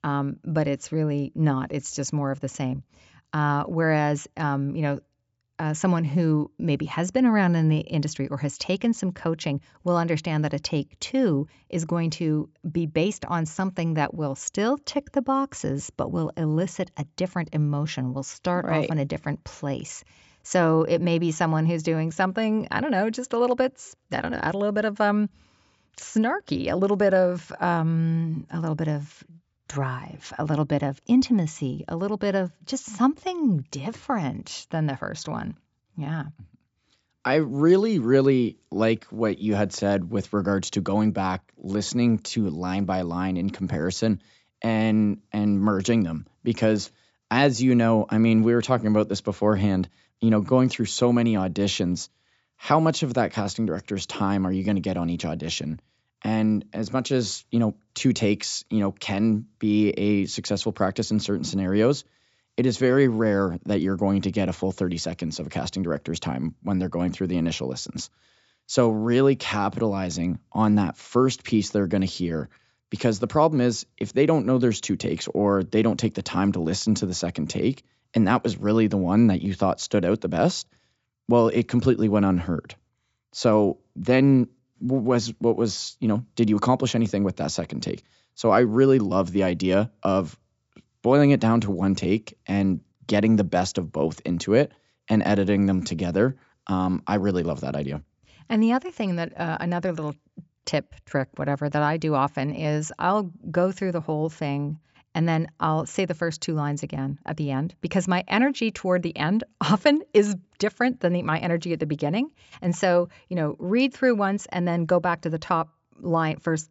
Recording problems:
high frequencies cut off; noticeable; nothing above 8 kHz

